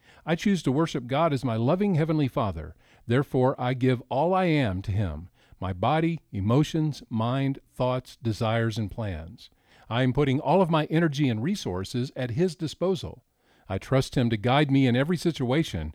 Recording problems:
none

